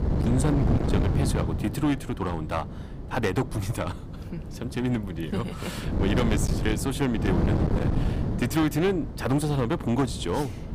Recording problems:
distortion; slight; 12% of the sound clipped
wind noise on the microphone; heavy; 6 dB below the speech

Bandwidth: 15 kHz